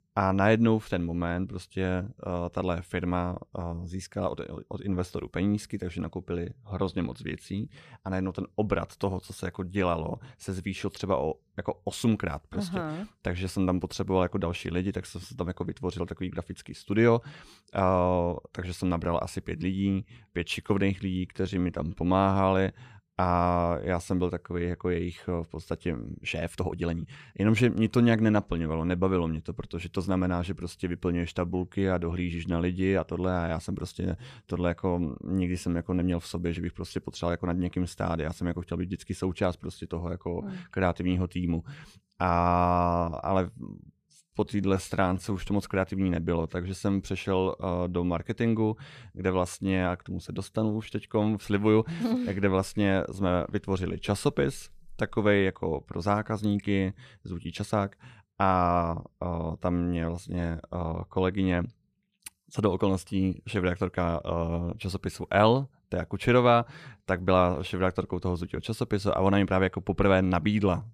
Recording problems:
uneven, jittery; strongly; from 21 to 45 s

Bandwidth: 14.5 kHz